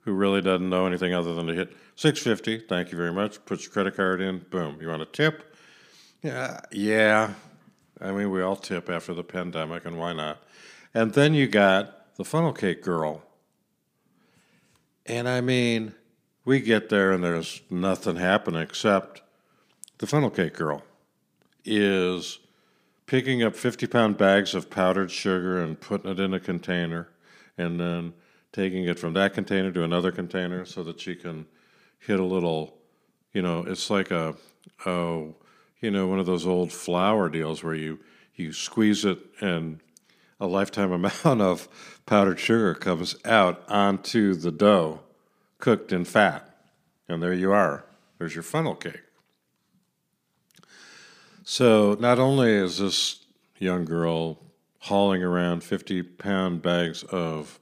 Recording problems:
none

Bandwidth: 15 kHz